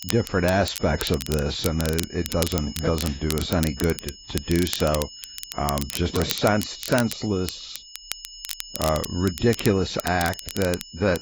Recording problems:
garbled, watery; badly; nothing above 7.5 kHz
crackle, like an old record; loud; 9 dB below the speech
high-pitched whine; noticeable; throughout; 5 kHz, 15 dB below the speech

